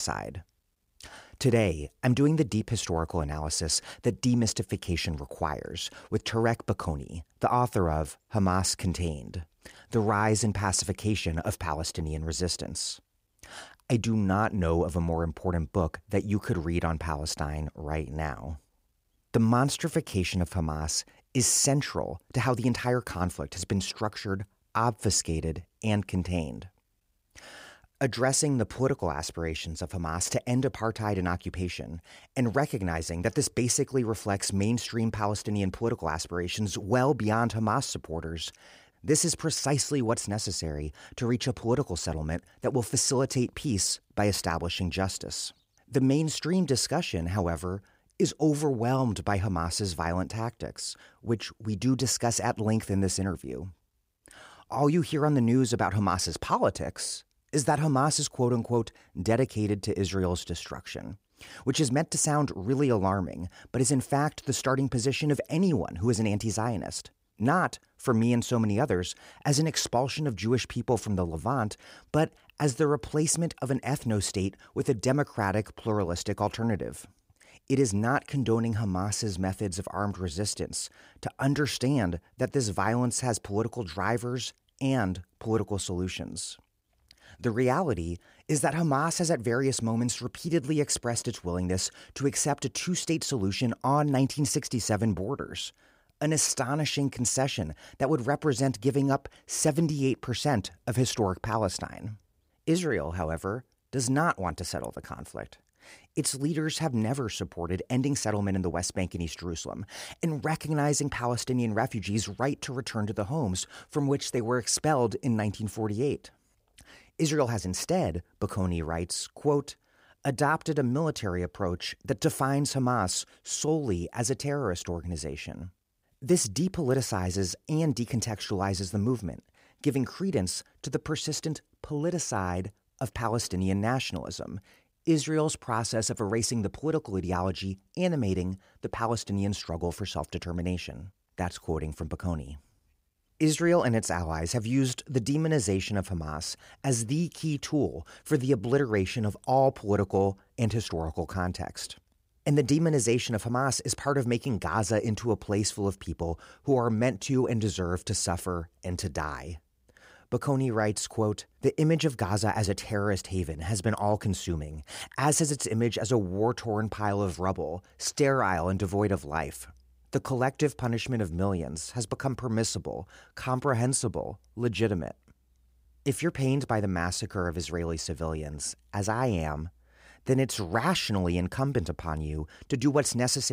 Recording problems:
abrupt cut into speech; at the start and the end

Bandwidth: 15.5 kHz